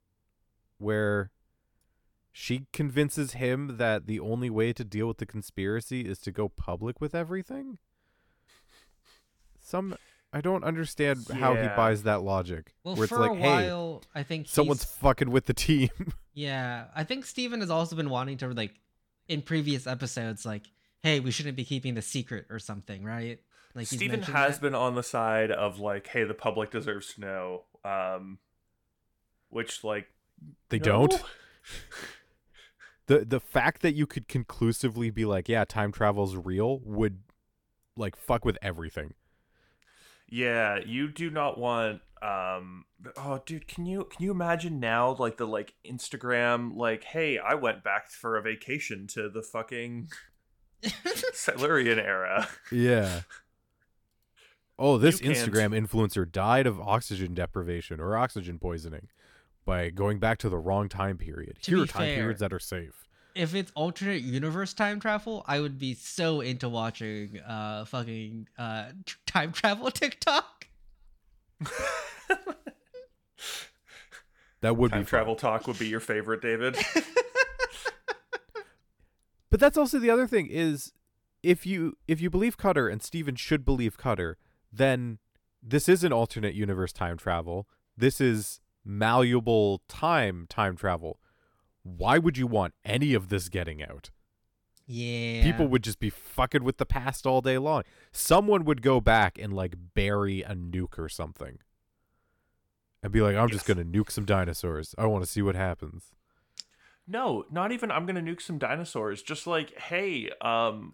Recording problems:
none

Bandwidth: 18 kHz